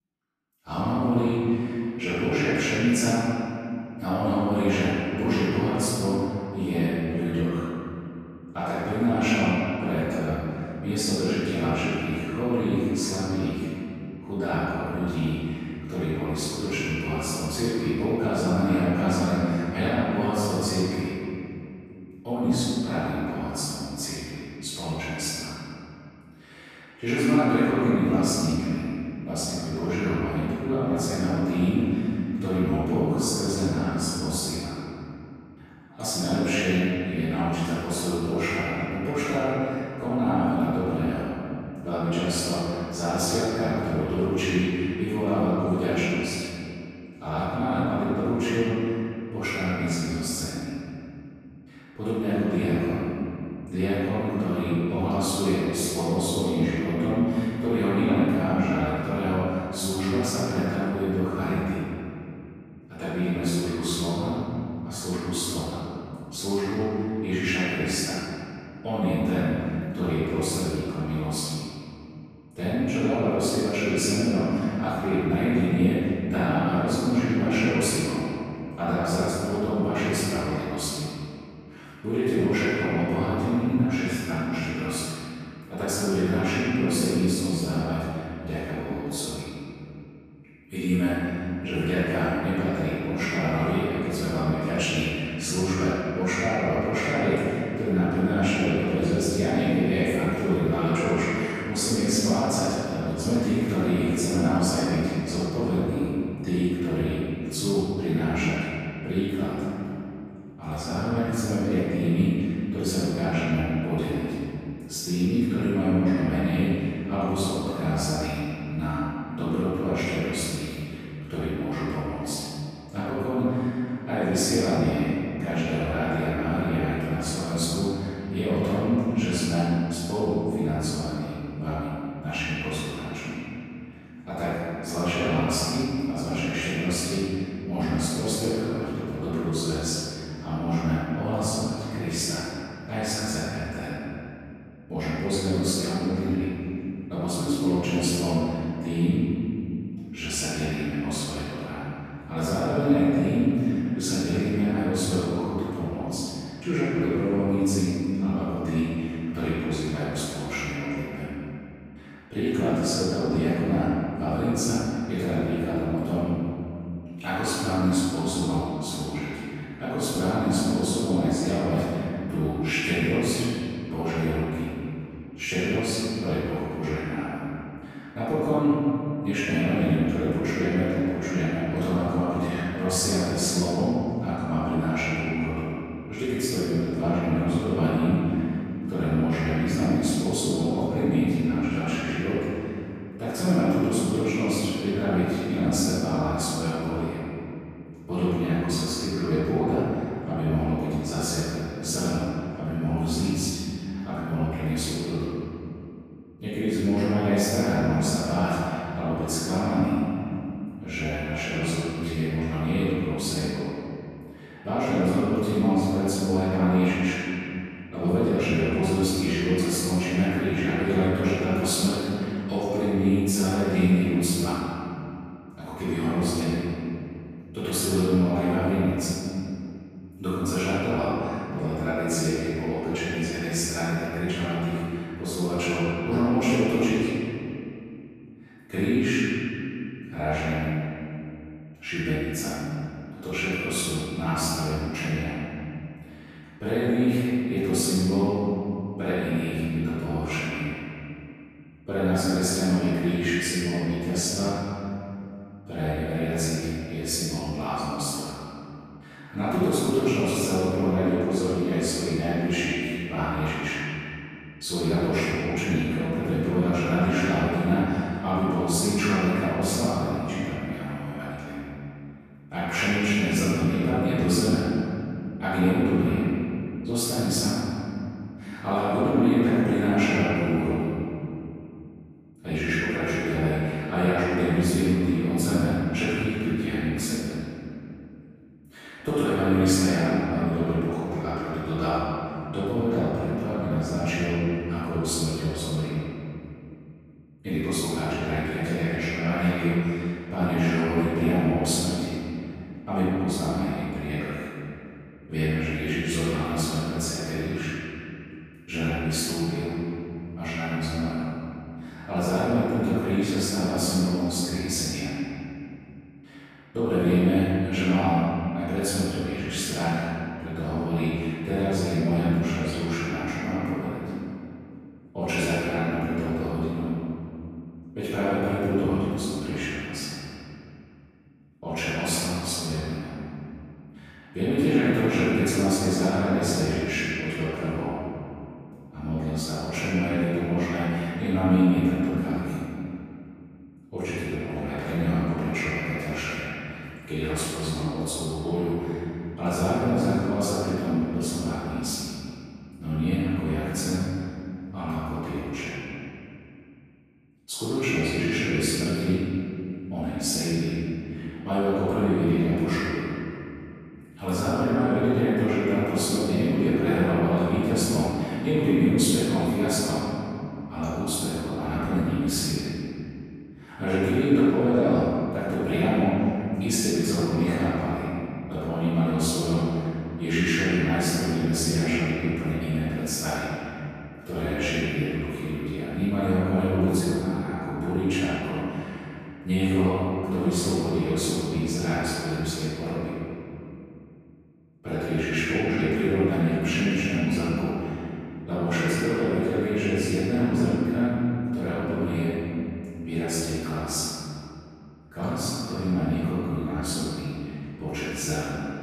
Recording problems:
room echo; strong; dies away in 2.6 s
off-mic speech; far

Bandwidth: 14.5 kHz